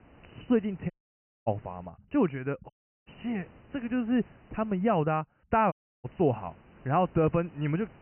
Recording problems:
high frequencies cut off; severe; nothing above 3 kHz
muffled; very slightly; fading above 2 kHz
hiss; faint; until 2 s, from 3 to 5 s and from 6 s on; 25 dB below the speech
audio cutting out; at 1 s for 0.5 s, at 2.5 s and at 5.5 s

